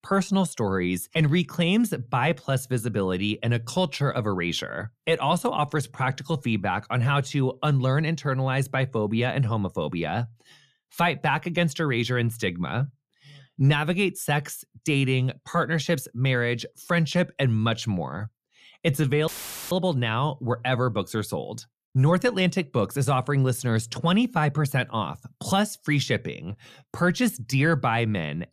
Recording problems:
audio cutting out; filled with static; at 19 s

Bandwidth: 14.5 kHz